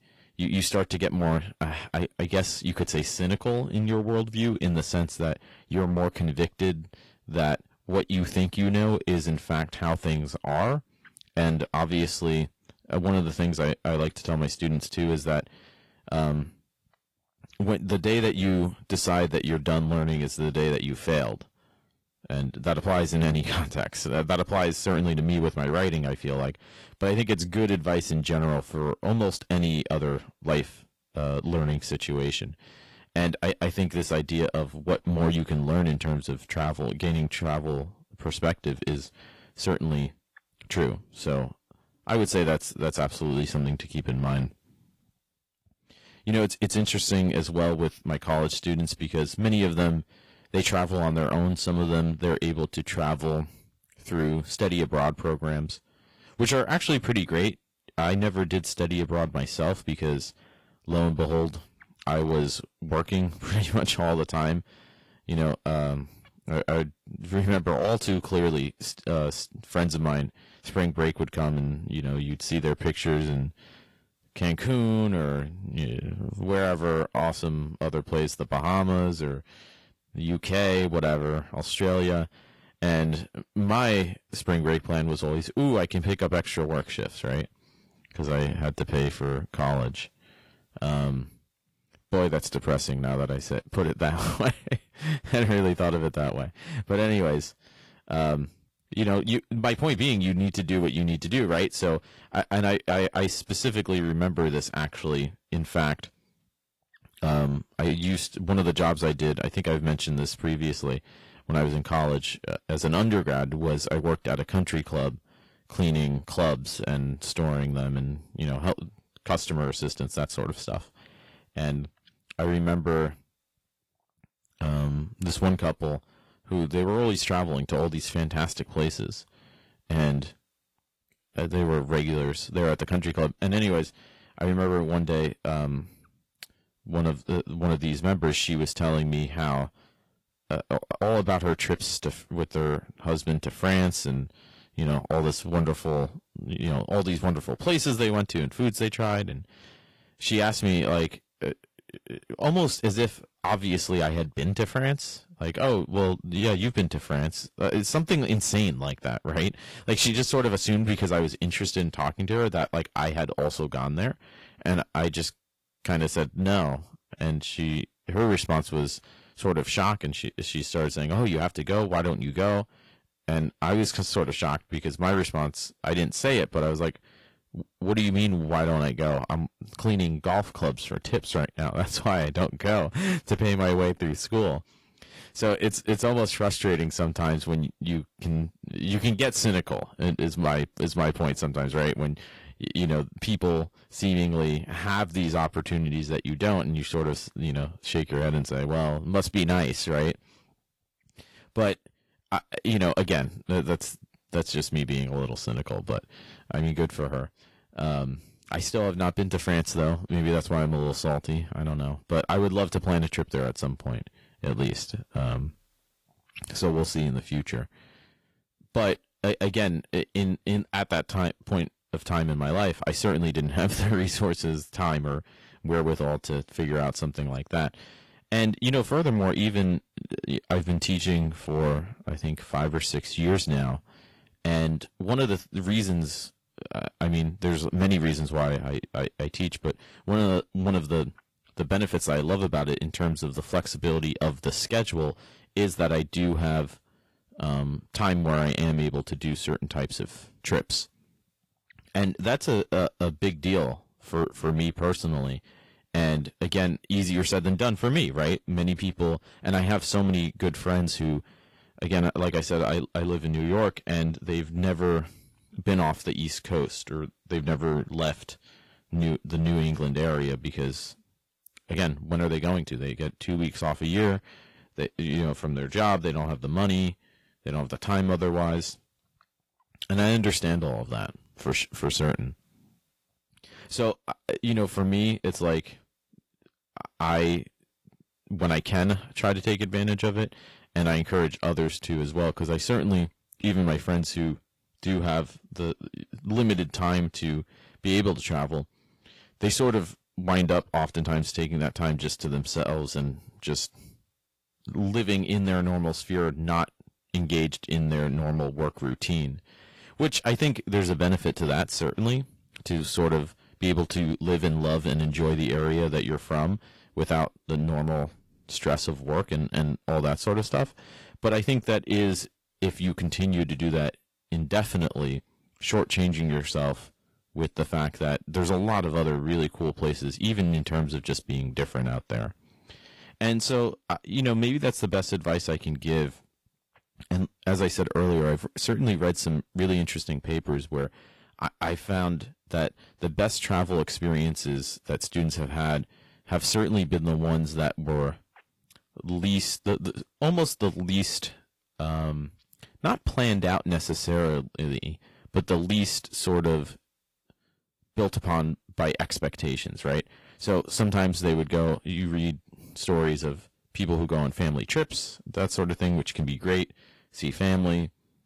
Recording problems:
distortion; slight; 4% of the sound clipped
garbled, watery; slightly

